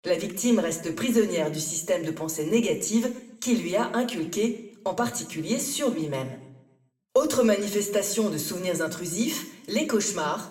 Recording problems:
room echo; slight; dies away in 0.6 s
off-mic speech; somewhat distant

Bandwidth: 16 kHz